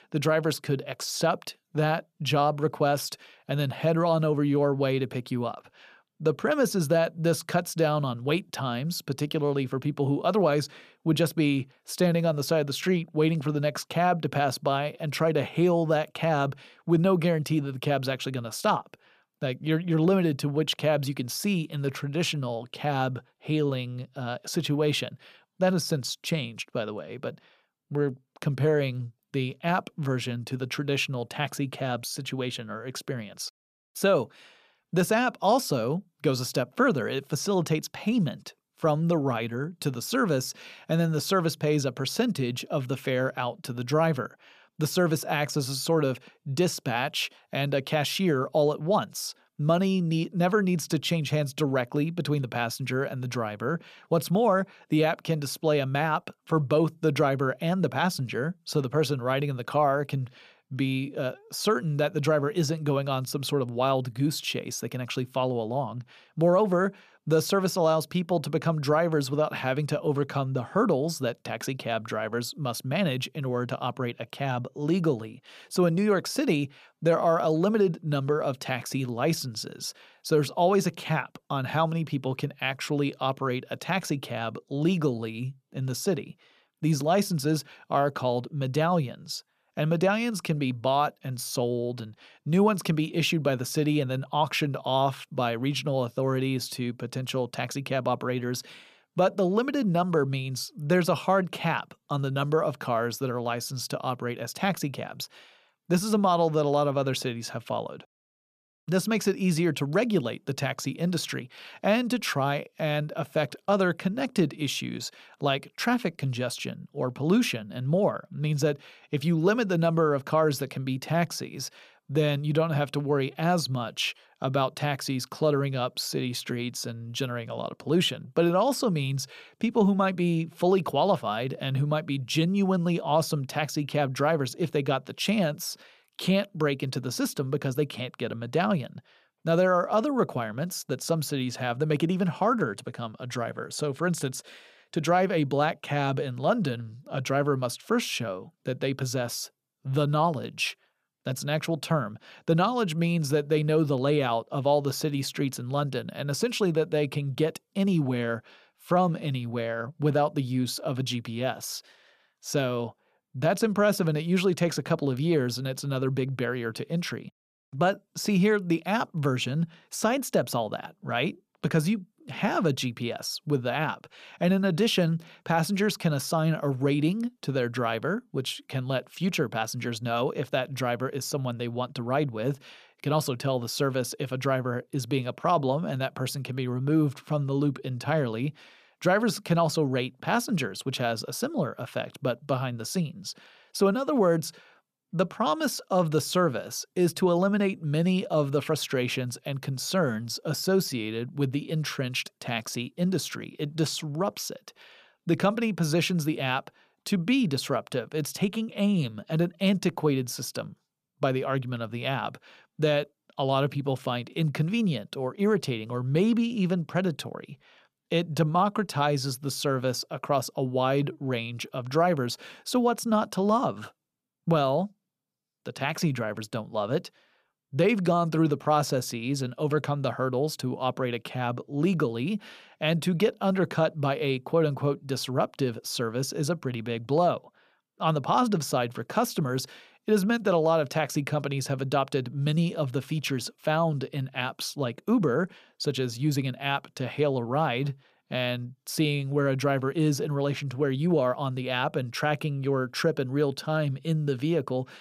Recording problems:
none

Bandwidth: 14.5 kHz